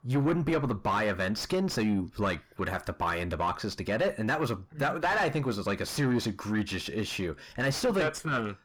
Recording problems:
distortion; heavy; 7 dB below the speech

